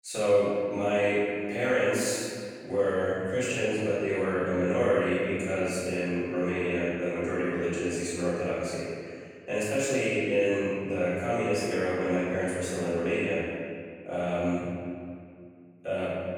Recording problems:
room echo; strong; dies away in 1.9 s
off-mic speech; far

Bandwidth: 18 kHz